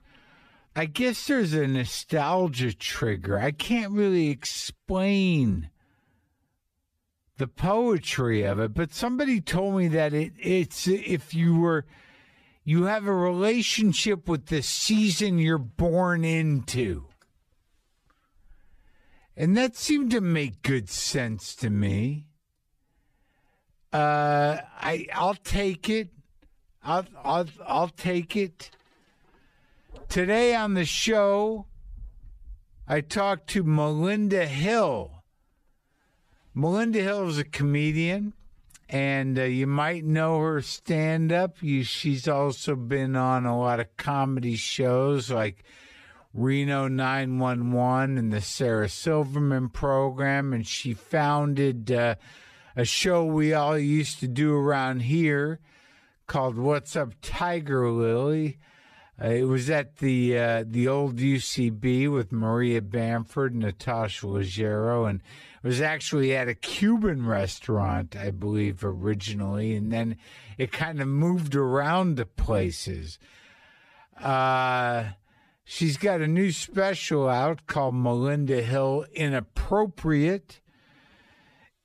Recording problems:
wrong speed, natural pitch; too slow; 0.6 times normal speed

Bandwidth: 14.5 kHz